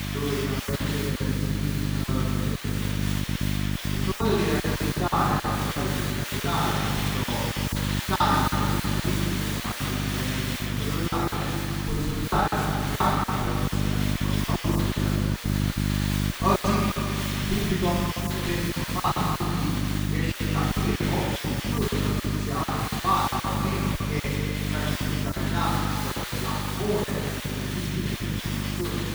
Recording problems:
room echo; strong; dies away in 2.3 s
off-mic speech; far
electrical hum; loud; throughout; 50 Hz, 10 dB below the speech
hiss; loud; throughout; 3 dB below the speech
choppy; very; 12% of the speech affected

